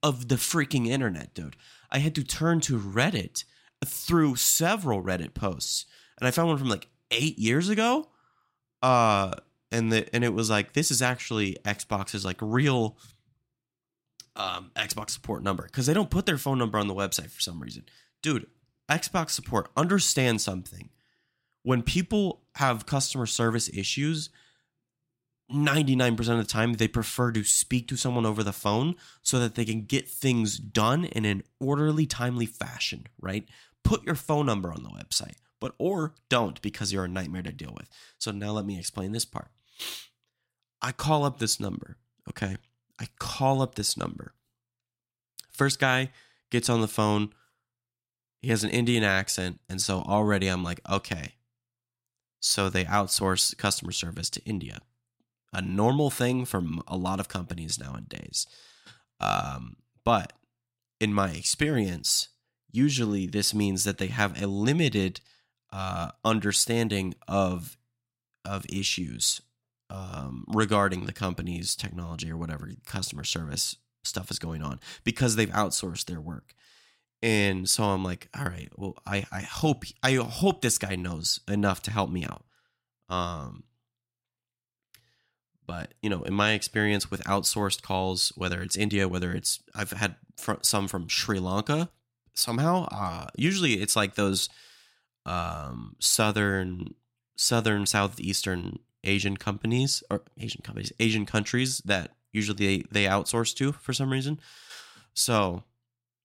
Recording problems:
none

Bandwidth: 16 kHz